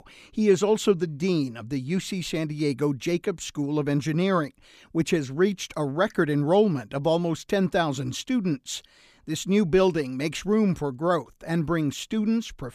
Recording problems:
none

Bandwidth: 14.5 kHz